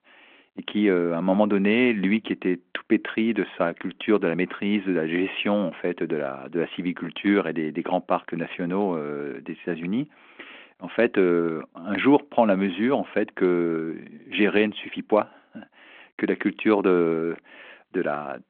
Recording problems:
phone-call audio

